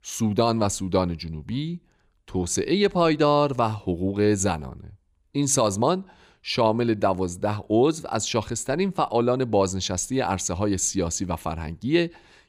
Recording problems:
none

